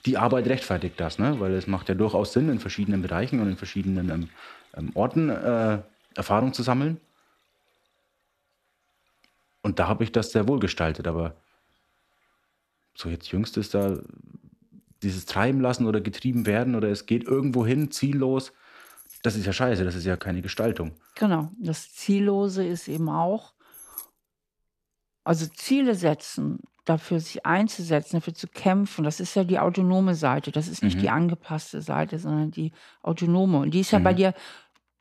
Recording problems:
household noises; faint; throughout; 25 dB below the speech

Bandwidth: 14 kHz